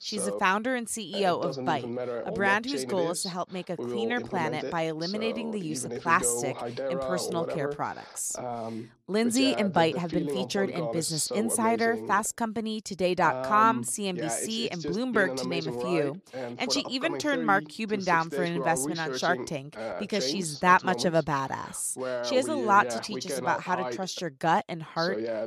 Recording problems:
voice in the background; loud; throughout; 7 dB below the speech

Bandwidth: 14.5 kHz